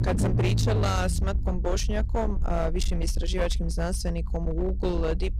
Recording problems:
distortion; slight; 19% of the sound clipped
low rumble; loud; throughout; 9 dB below the speech

